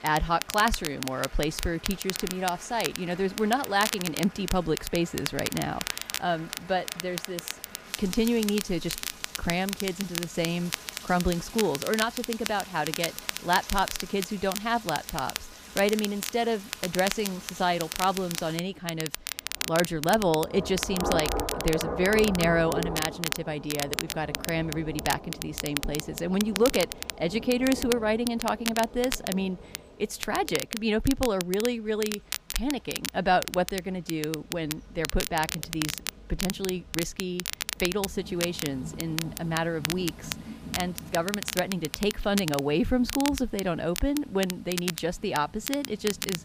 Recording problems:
crackle, like an old record; loud; 6 dB below the speech
rain or running water; noticeable; throughout; 15 dB below the speech

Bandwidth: 15 kHz